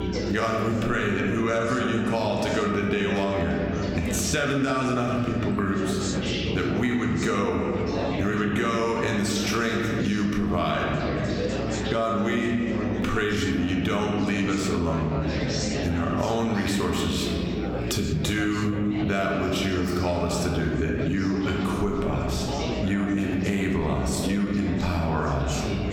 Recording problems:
room echo; noticeable; dies away in 1.4 s
off-mic speech; somewhat distant
squashed, flat; somewhat, background pumping
chatter from many people; loud; throughout; 8 dB below the speech
electrical hum; noticeable; throughout; 60 Hz, 20 dB below the speech

